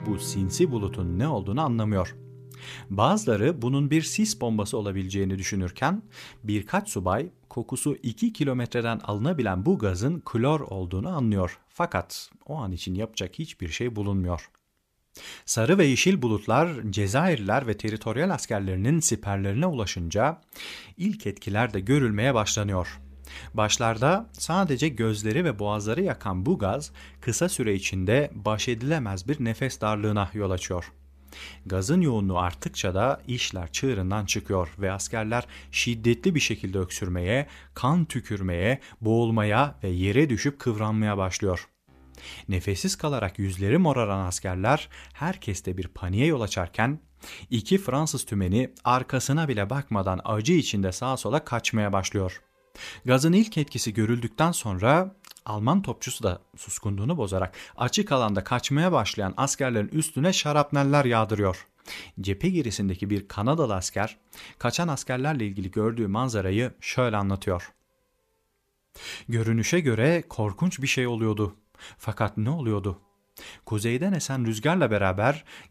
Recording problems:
background music; faint; throughout; 20 dB below the speech

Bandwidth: 14.5 kHz